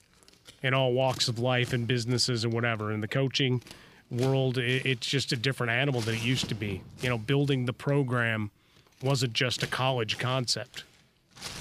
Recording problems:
household noises; noticeable; throughout; 15 dB below the speech

